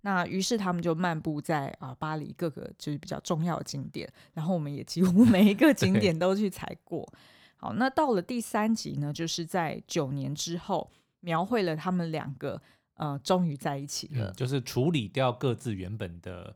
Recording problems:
none

